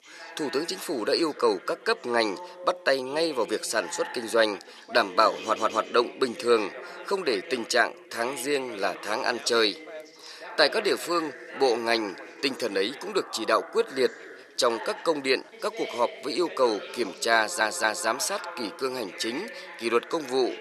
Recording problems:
thin; very; fading below 600 Hz
background chatter; noticeable; throughout; 2 voices, 15 dB below the speech
audio stuttering; at 5.5 s and at 17 s

